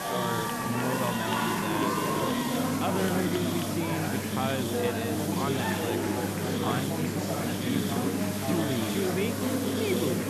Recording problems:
murmuring crowd; very loud; throughout; 4 dB above the speech
electrical hum; loud; from 2.5 s on; 50 Hz, 8 dB below the speech
hiss; loud; throughout; 4 dB below the speech
train or aircraft noise; faint; throughout; 20 dB below the speech

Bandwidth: 13.5 kHz